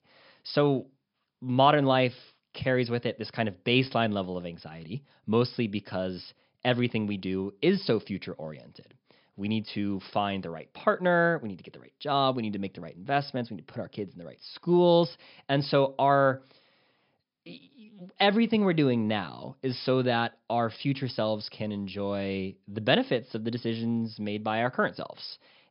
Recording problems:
high frequencies cut off; noticeable; nothing above 5.5 kHz

